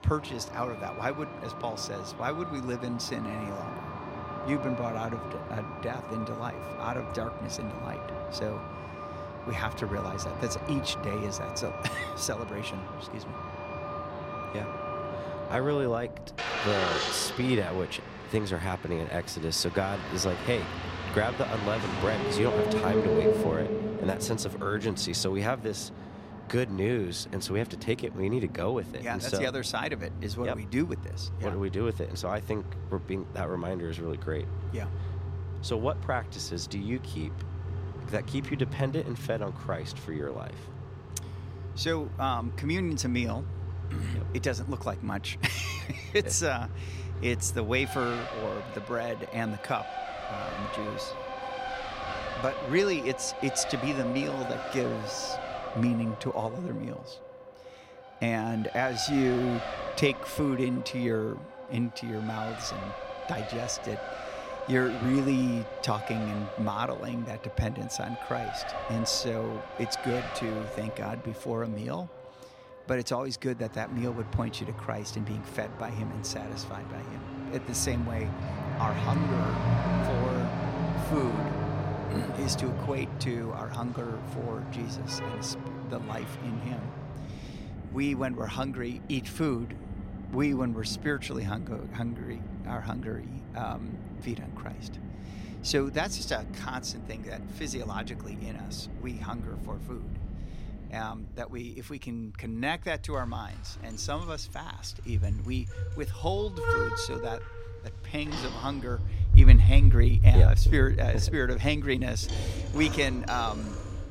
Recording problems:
traffic noise; loud; throughout; 1 dB below the speech

